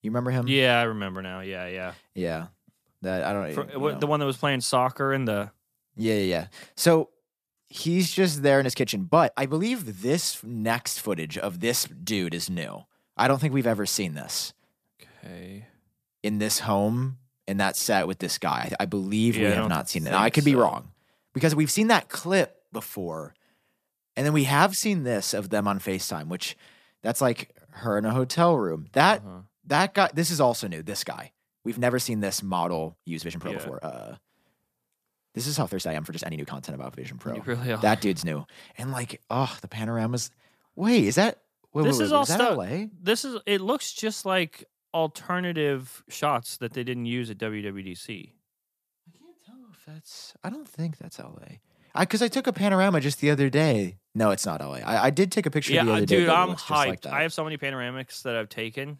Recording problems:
uneven, jittery; strongly; from 5.5 to 58 s

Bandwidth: 14.5 kHz